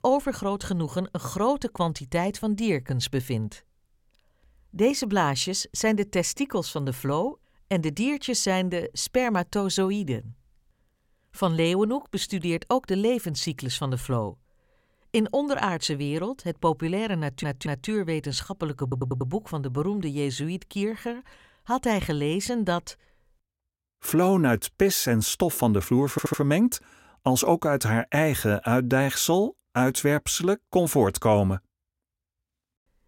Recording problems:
audio stuttering; at 17 s, at 19 s and at 26 s

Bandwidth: 16.5 kHz